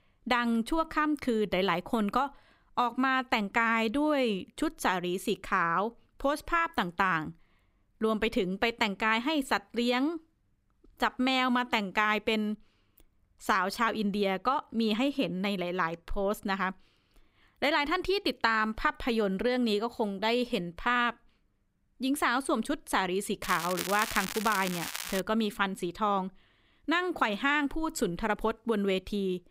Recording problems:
crackling; loud; from 23 to 25 s; 7 dB below the speech

